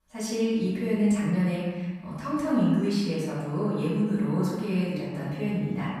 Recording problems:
room echo; strong; dies away in 1.3 s
off-mic speech; far

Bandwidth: 14.5 kHz